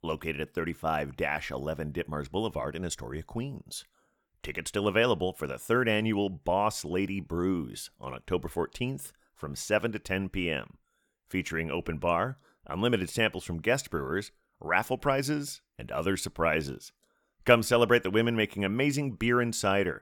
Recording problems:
none

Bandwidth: 18.5 kHz